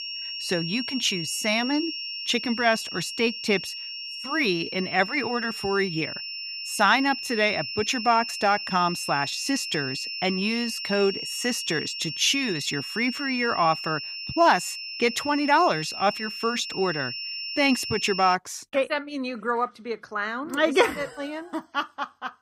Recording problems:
high-pitched whine; loud; until 18 s; 5.5 kHz, 6 dB below the speech

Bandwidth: 15.5 kHz